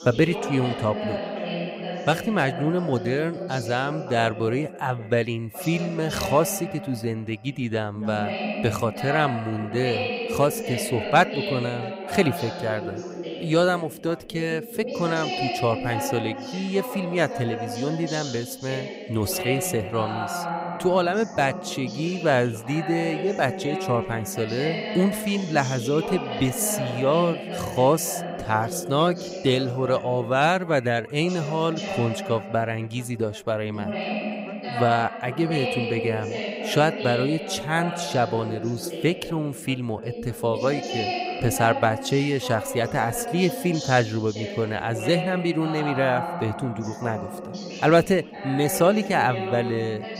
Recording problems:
background chatter; loud; throughout; 2 voices, 6 dB below the speech

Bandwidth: 15.5 kHz